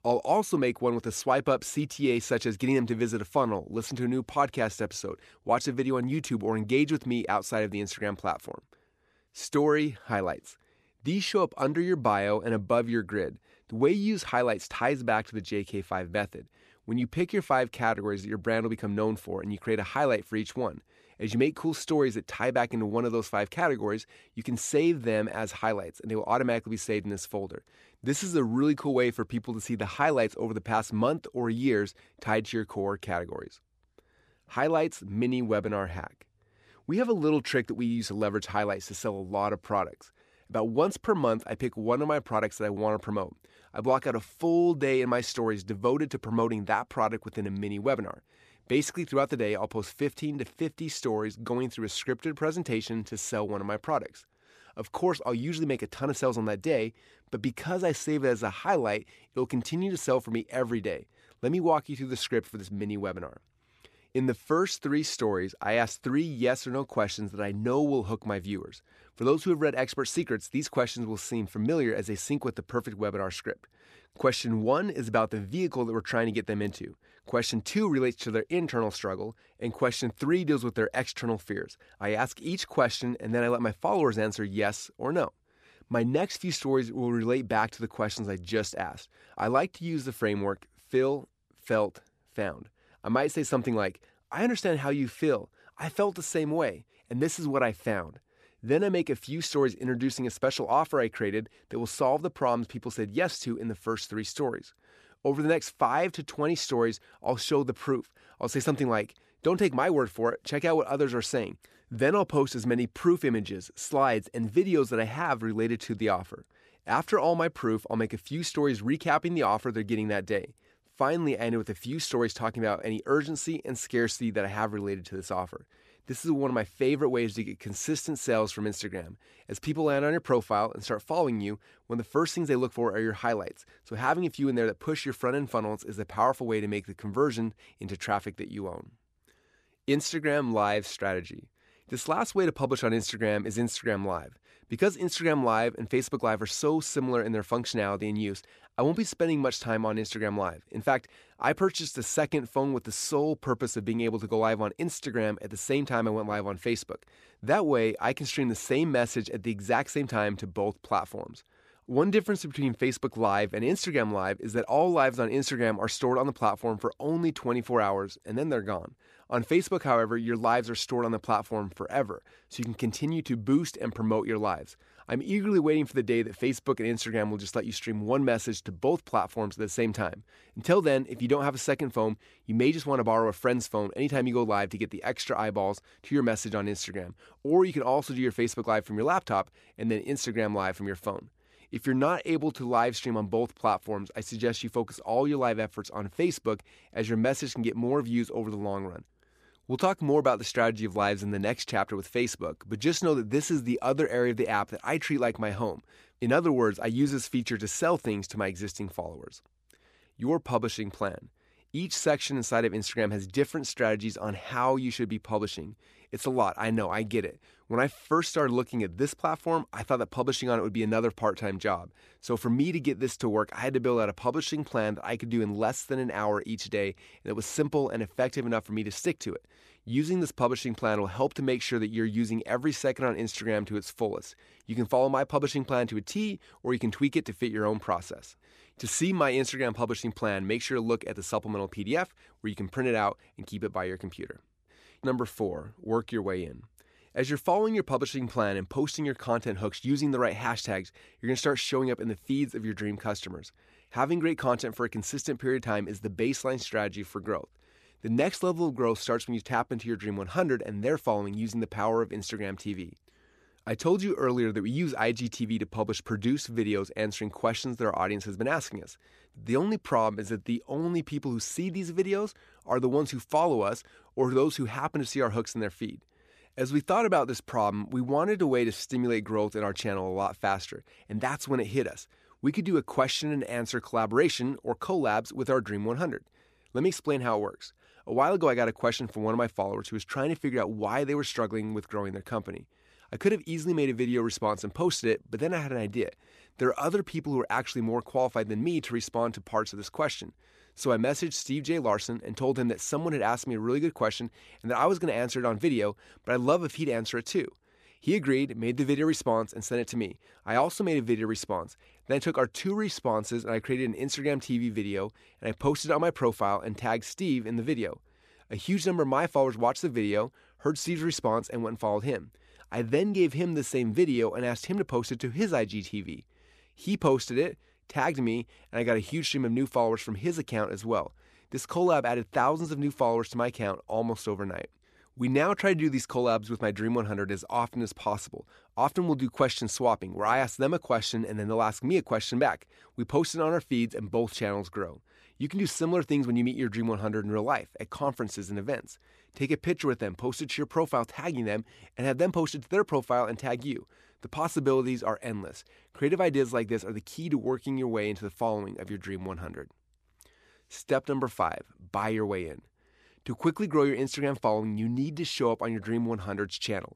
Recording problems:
none

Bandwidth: 14.5 kHz